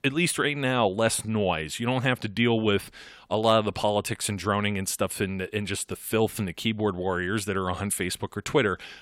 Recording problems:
none

